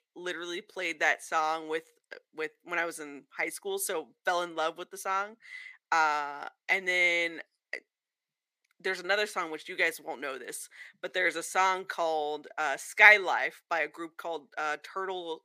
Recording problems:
thin; very; fading below 500 Hz

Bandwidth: 15 kHz